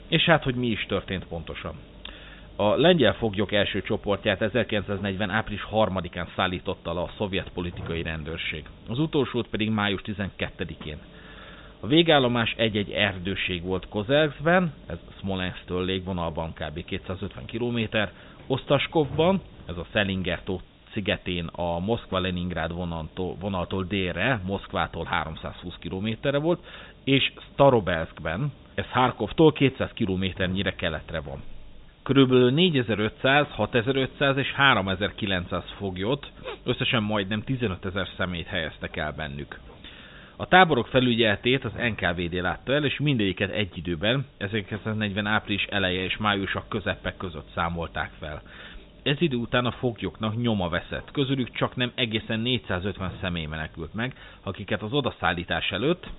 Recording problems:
high frequencies cut off; severe; nothing above 4 kHz
hiss; faint; throughout; 25 dB below the speech

